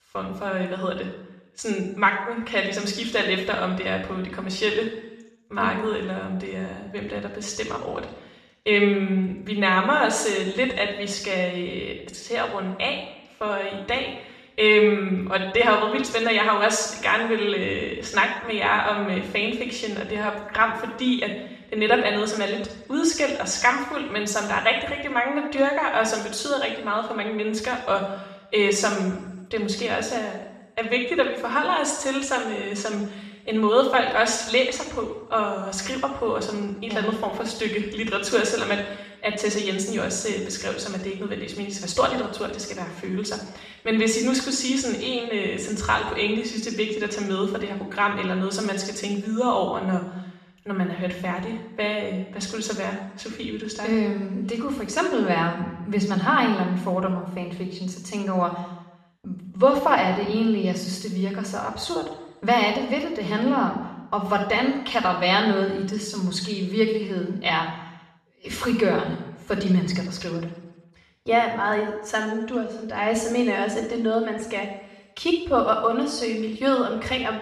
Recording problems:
off-mic speech; far
room echo; noticeable; dies away in 0.8 s

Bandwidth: 13.5 kHz